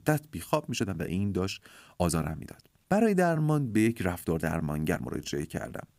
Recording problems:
uneven, jittery; strongly; from 0.5 to 5.5 s

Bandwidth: 15.5 kHz